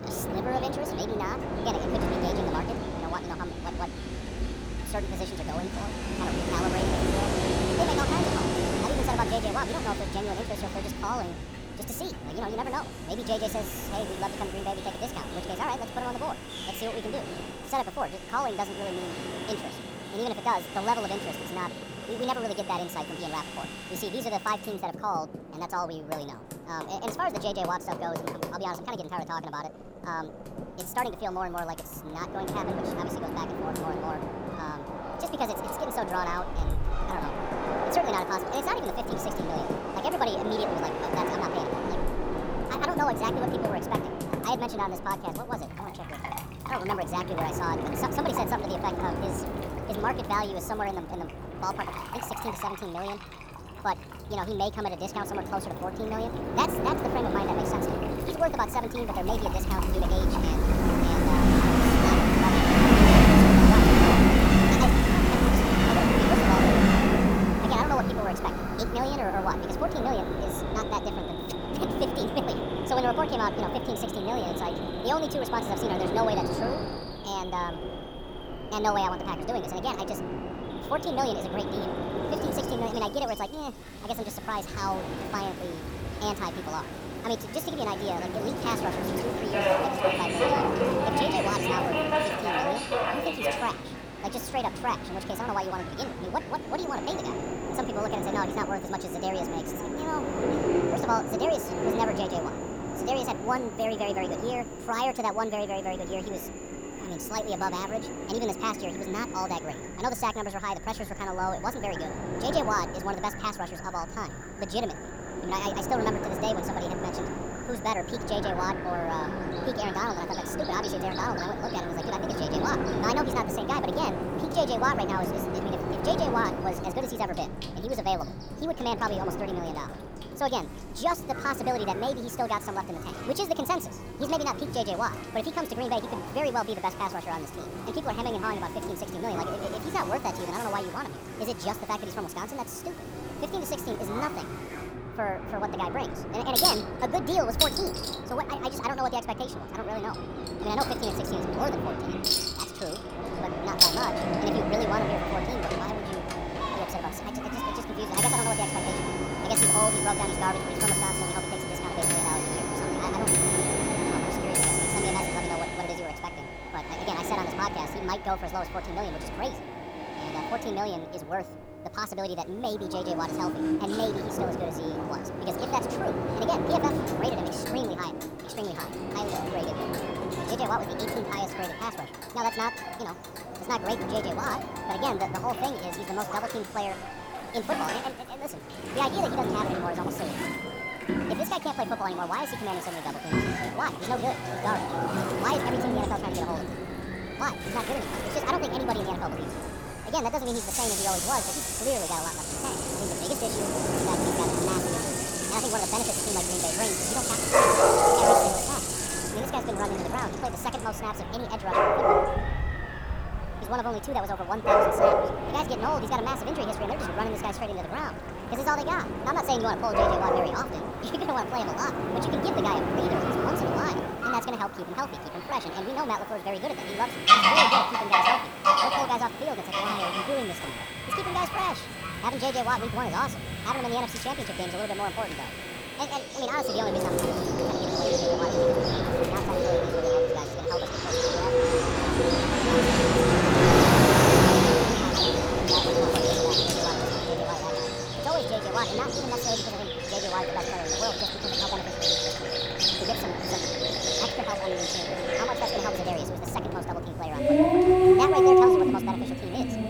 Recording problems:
wrong speed and pitch; too fast and too high; 1.5 times normal speed
animal sounds; very loud; throughout; 3 dB above the speech
train or aircraft noise; very loud; throughout; 2 dB above the speech
household noises; loud; throughout; 1 dB below the speech

